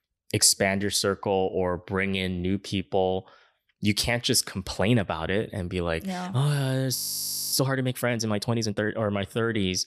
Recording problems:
audio freezing; at 7 s for 0.5 s

